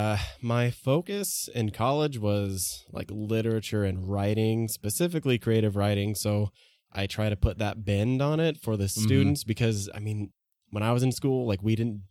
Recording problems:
abrupt cut into speech; at the start

